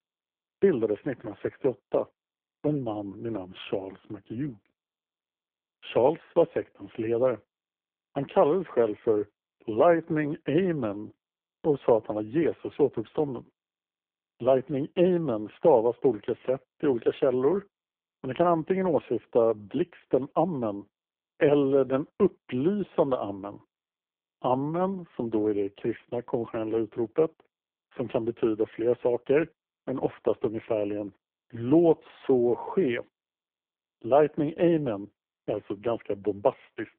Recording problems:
phone-call audio; poor line

